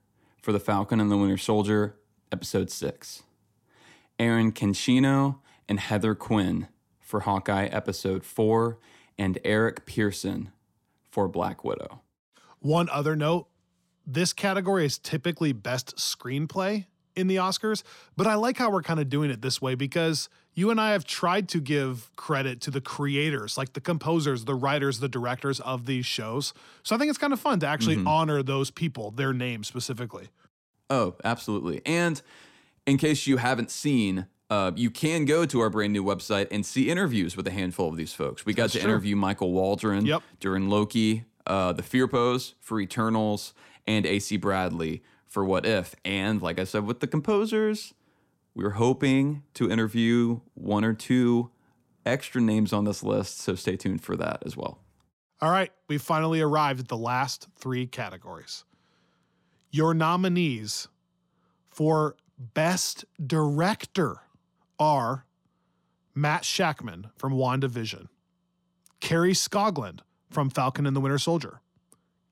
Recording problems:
none

